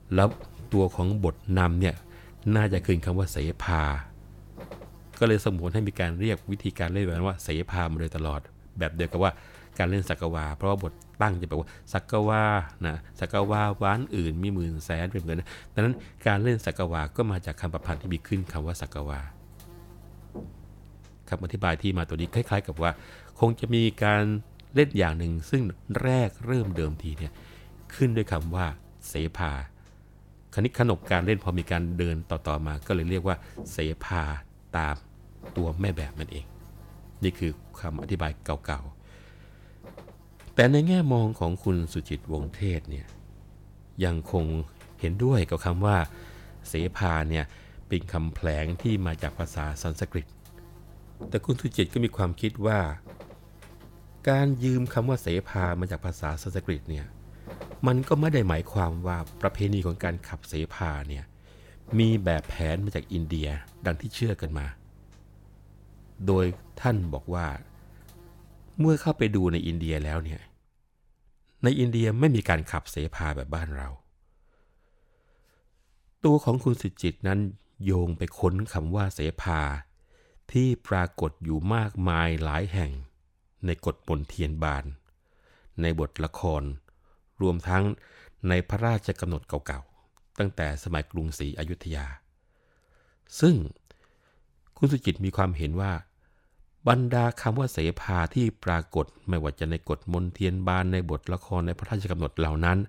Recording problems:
electrical hum; faint; until 1:10; 50 Hz, 20 dB below the speech

